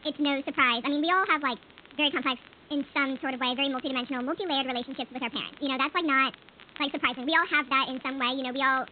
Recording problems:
high frequencies cut off; severe; nothing above 4 kHz
wrong speed and pitch; too fast and too high; 1.5 times normal speed
hiss; faint; throughout; 25 dB below the speech
crackle, like an old record; faint; 25 dB below the speech

